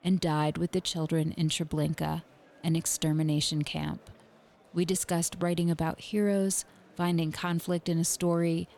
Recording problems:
murmuring crowd; faint; throughout; 30 dB below the speech

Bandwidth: 18 kHz